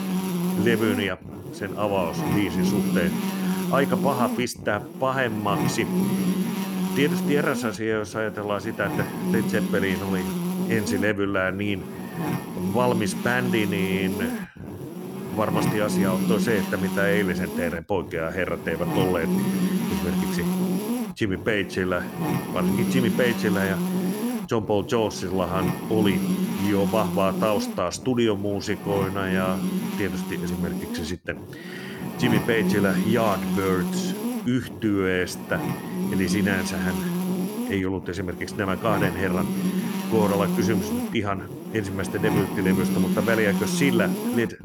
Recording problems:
electrical hum; loud; throughout; 50 Hz, 5 dB below the speech

